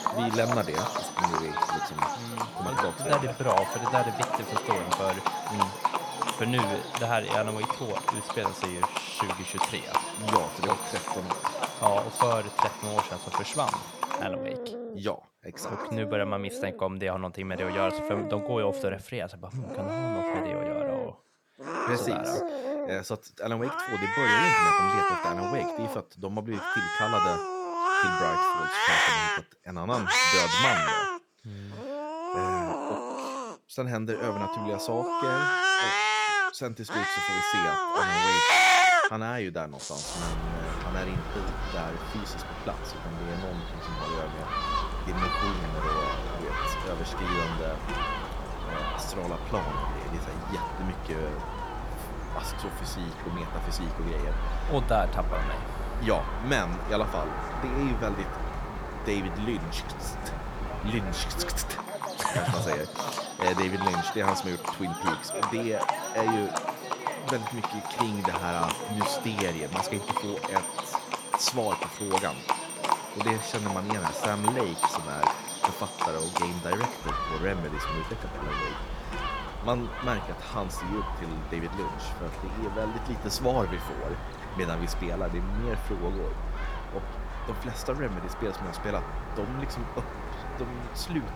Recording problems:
animal sounds; very loud; throughout; 4 dB above the speech

